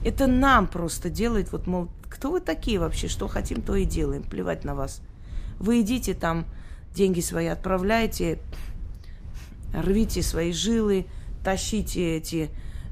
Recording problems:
wind noise on the microphone; occasional gusts; 25 dB below the speech

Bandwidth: 15 kHz